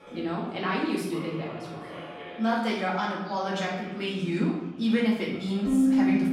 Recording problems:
off-mic speech; far
room echo; noticeable; dies away in 0.8 s
background music; very loud; throughout; 5 dB above the speech
chatter from many people; noticeable; throughout; 15 dB below the speech

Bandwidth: 16.5 kHz